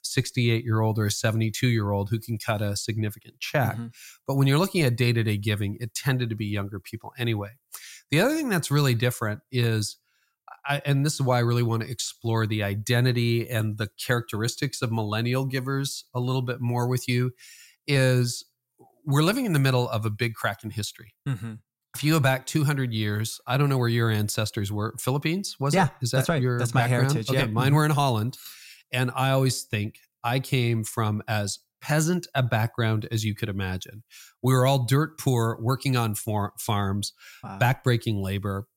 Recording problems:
none

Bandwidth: 16 kHz